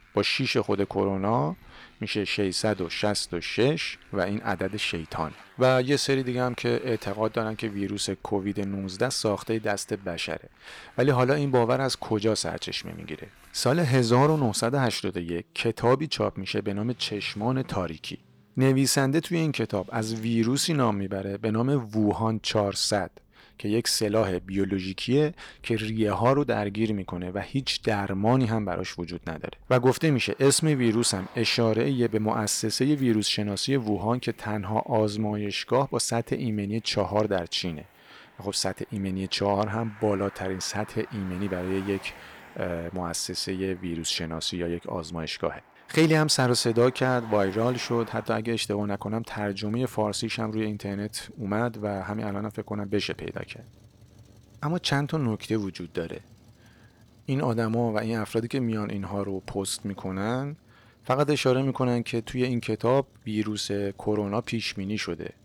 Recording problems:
traffic noise; faint; throughout; 25 dB below the speech

